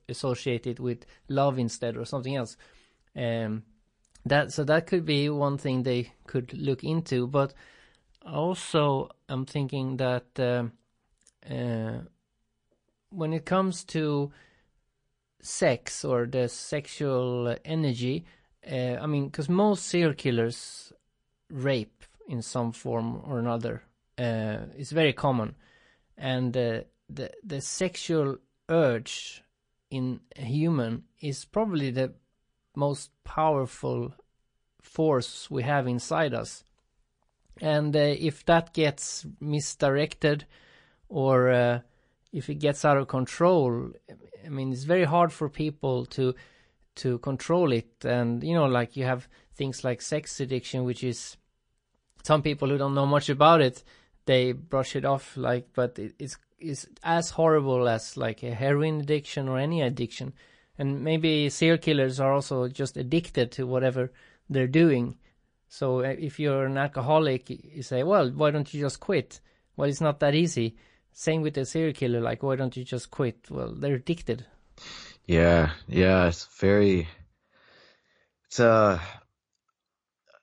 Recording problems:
garbled, watery; slightly; nothing above 8 kHz

